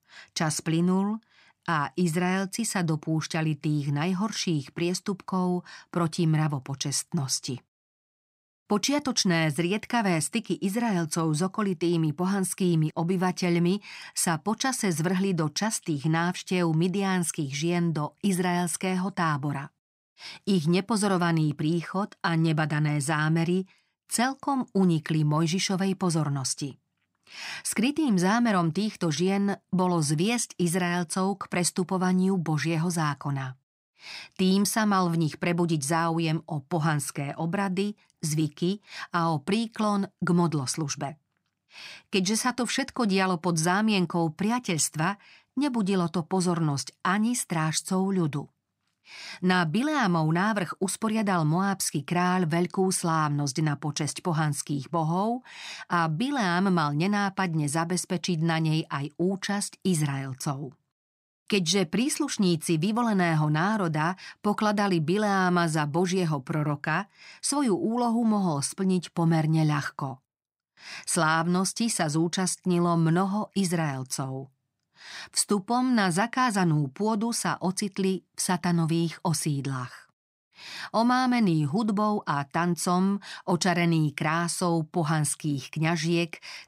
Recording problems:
none

